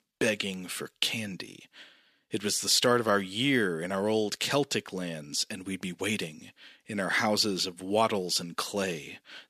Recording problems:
thin; very slightly; fading below 450 Hz

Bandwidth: 14.5 kHz